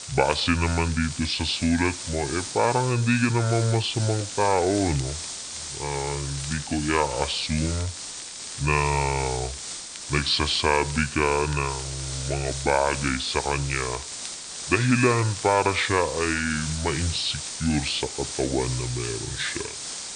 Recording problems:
wrong speed and pitch; too slow and too low; 0.6 times normal speed
high frequencies cut off; noticeable; nothing above 5.5 kHz
hiss; loud; throughout; 8 dB below the speech
crackle, like an old record; faint; 20 dB below the speech

